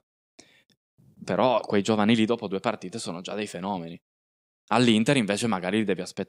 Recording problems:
none

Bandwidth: 15.5 kHz